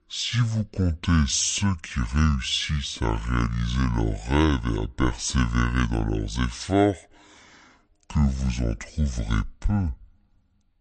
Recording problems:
wrong speed and pitch; too slow and too low; 0.6 times normal speed

